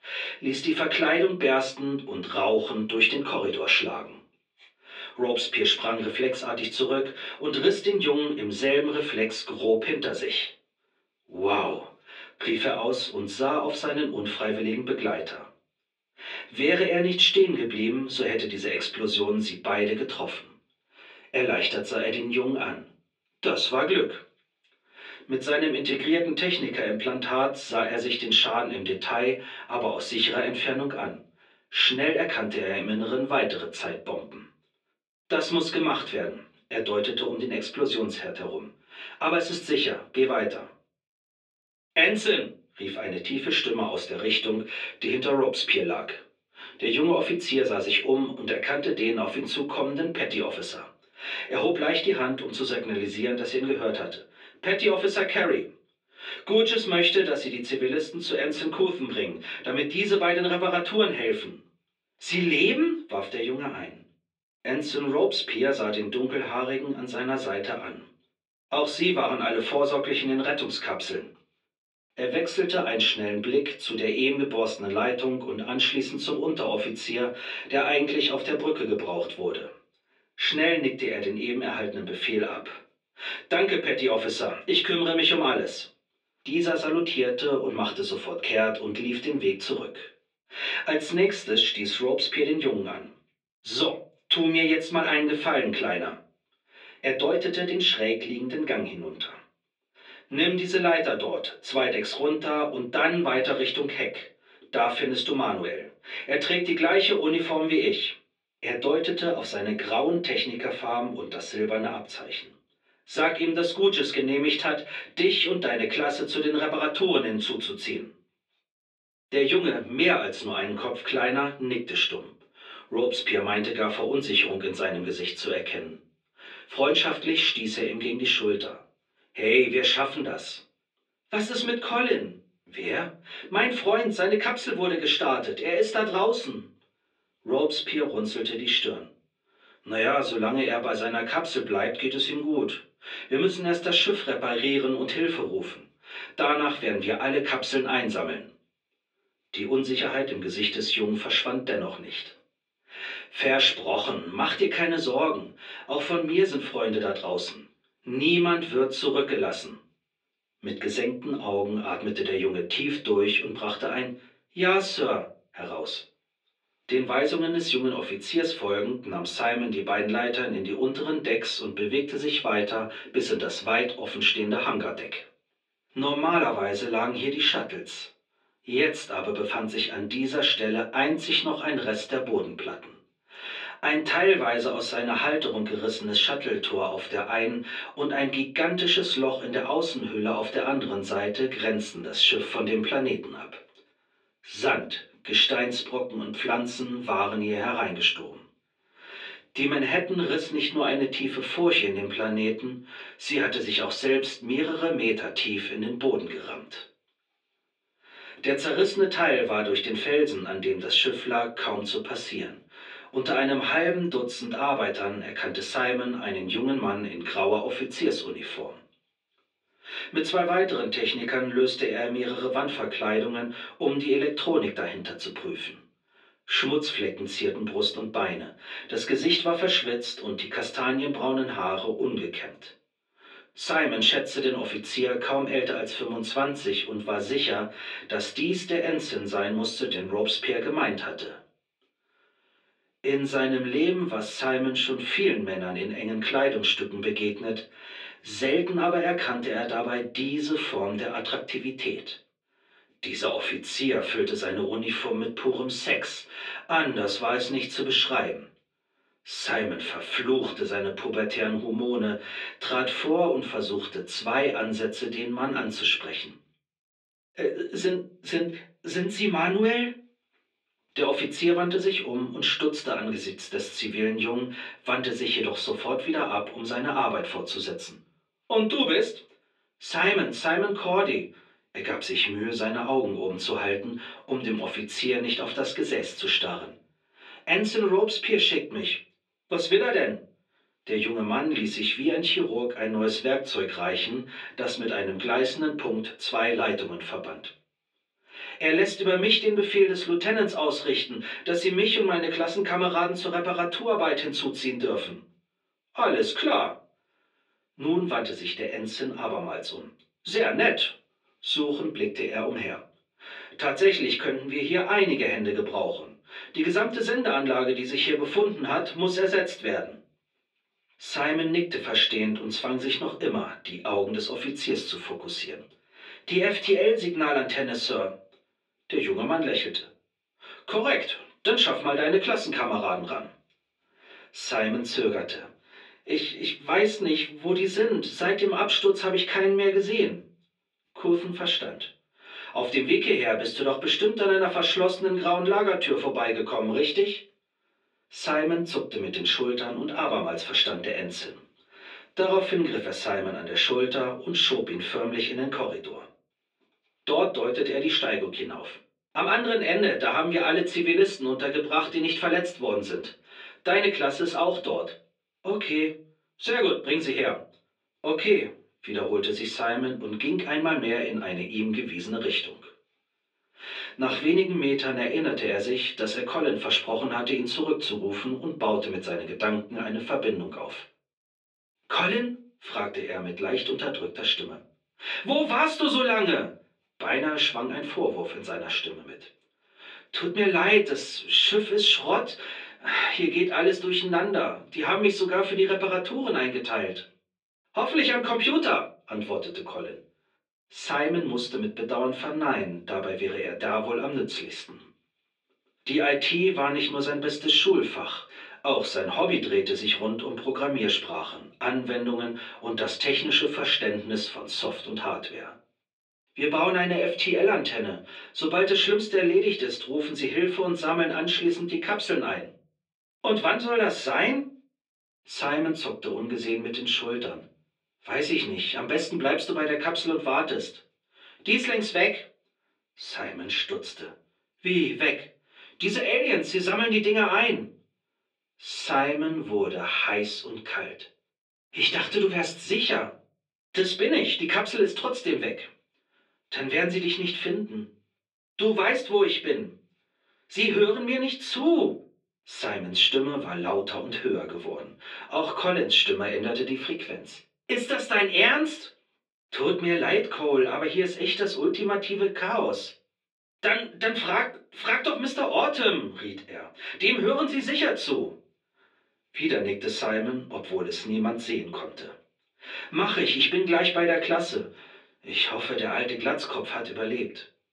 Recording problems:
off-mic speech; far
thin; somewhat; fading below 300 Hz
room echo; very slight; dies away in 0.3 s
muffled; very slightly; fading above 3 kHz

